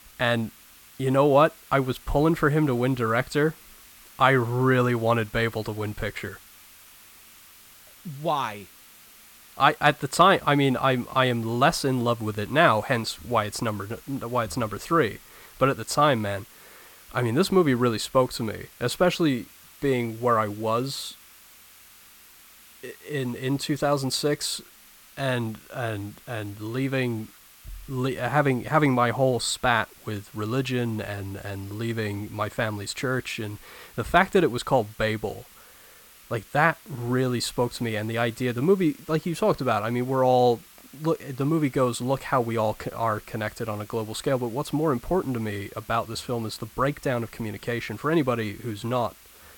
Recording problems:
hiss; faint; throughout; 25 dB below the speech

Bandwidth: 17 kHz